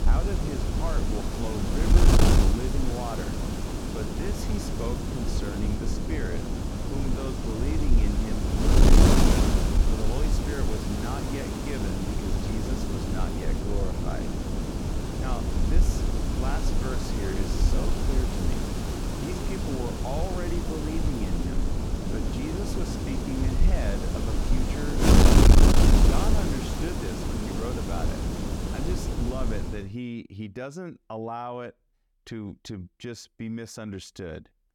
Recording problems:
wind noise on the microphone; heavy; until 30 s; 5 dB above the speech

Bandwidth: 17.5 kHz